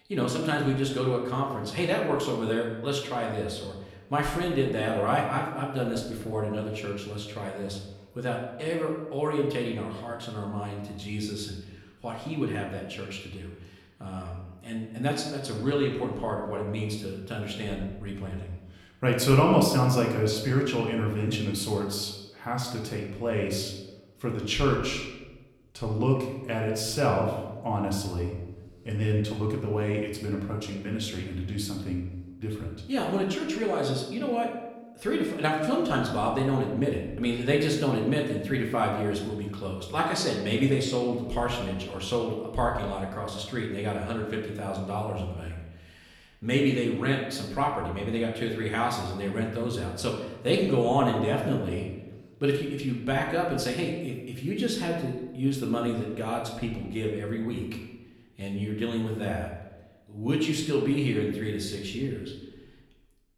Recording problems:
room echo; noticeable; dies away in 0.9 s
off-mic speech; somewhat distant

